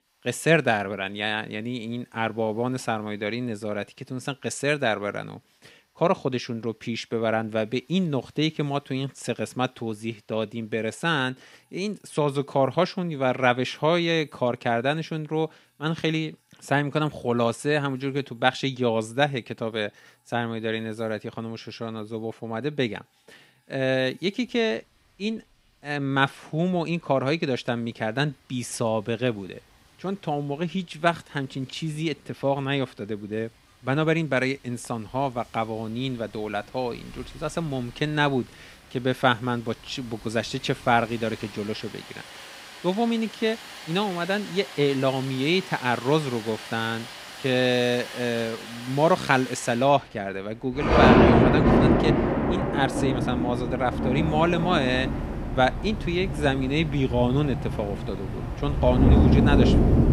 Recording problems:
rain or running water; very loud; throughout; 1 dB above the speech

